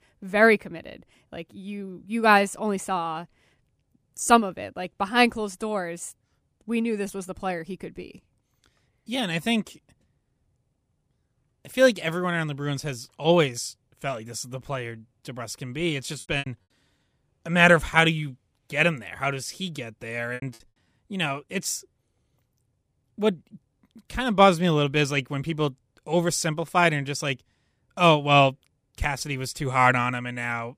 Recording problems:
choppy; very; at 16 s and at 20 s; 14% of the speech affected

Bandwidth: 15 kHz